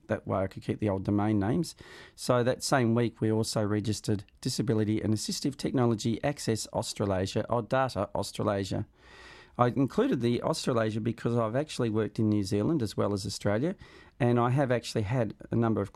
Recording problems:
none

